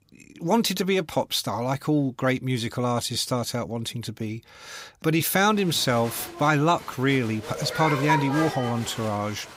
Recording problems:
crowd noise; loud; from 5.5 s on; 8 dB below the speech

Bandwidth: 15.5 kHz